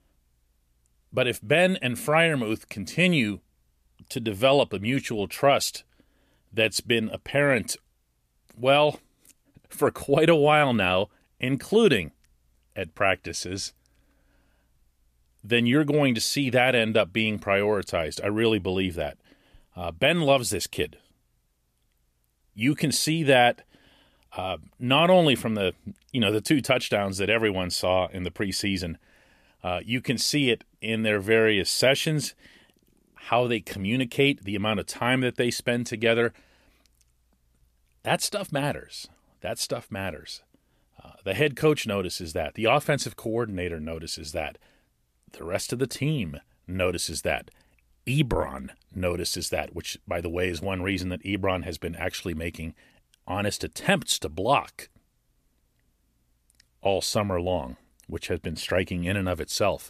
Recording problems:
none

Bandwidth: 14.5 kHz